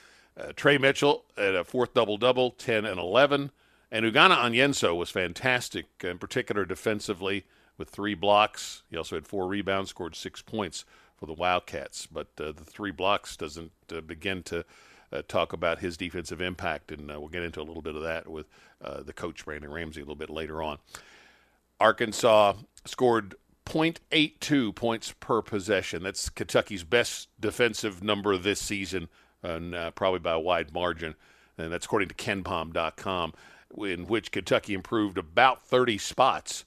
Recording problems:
none

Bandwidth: 14.5 kHz